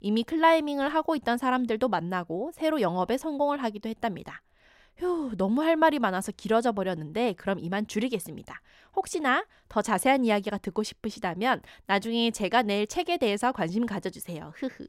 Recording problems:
none

